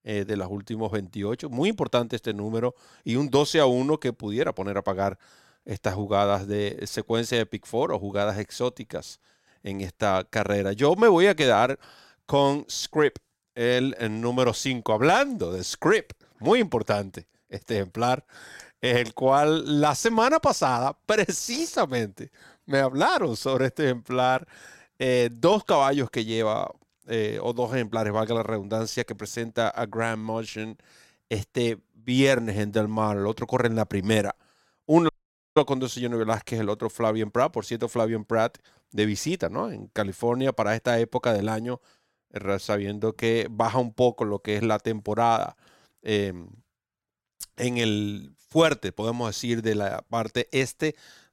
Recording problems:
audio cutting out; at 35 s

